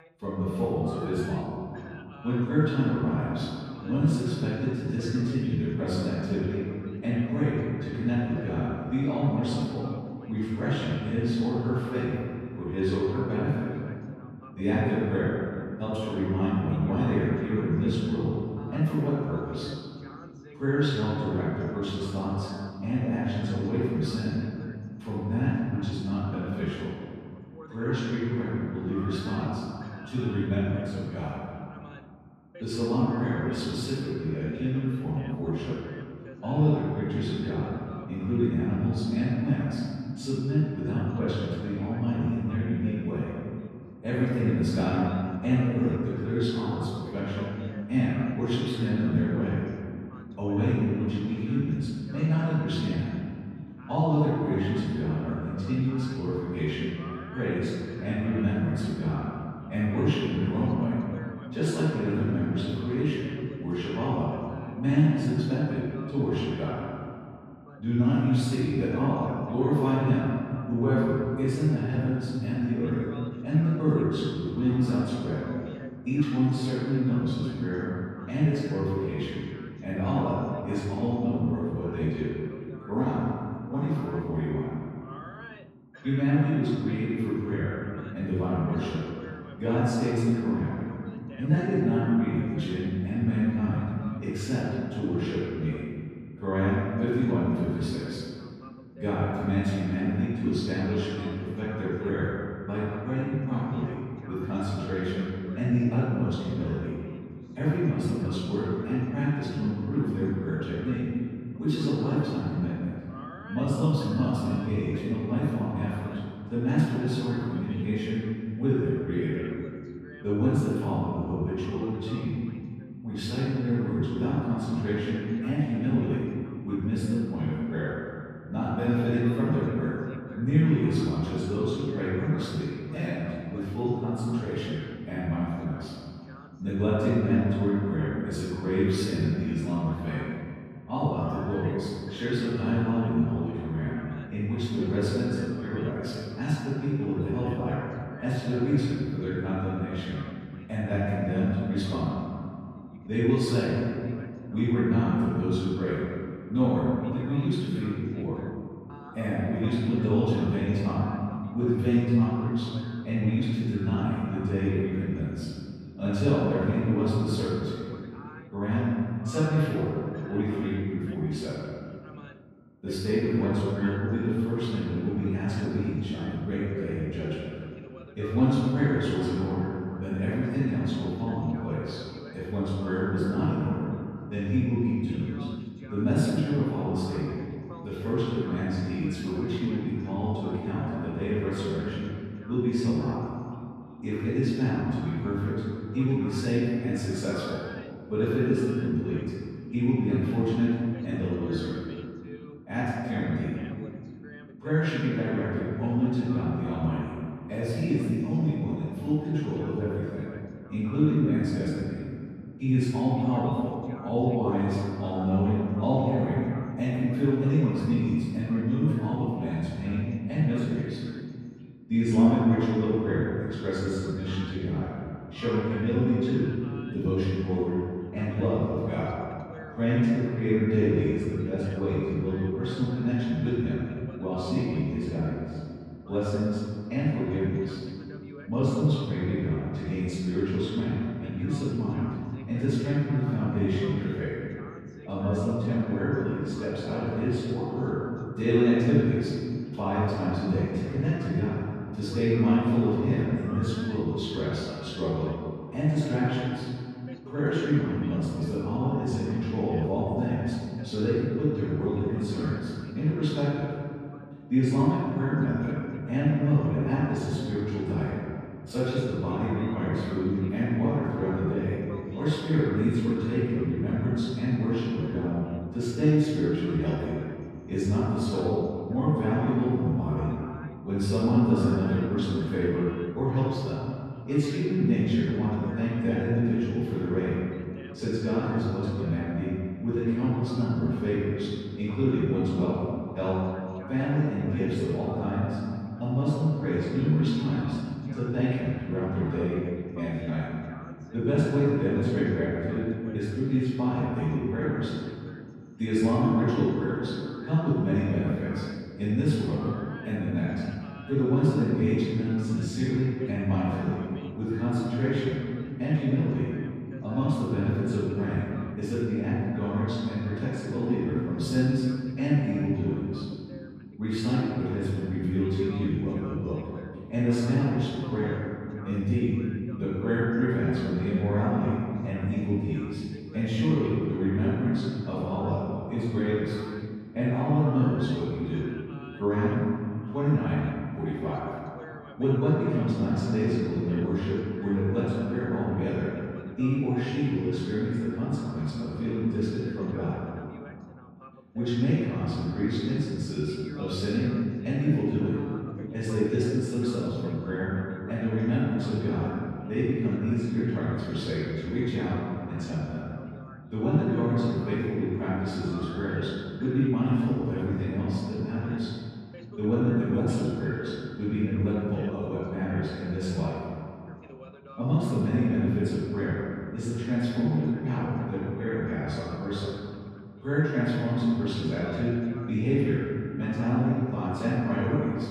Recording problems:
room echo; strong; dies away in 2.3 s
off-mic speech; far
voice in the background; faint; throughout; 20 dB below the speech

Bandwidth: 15 kHz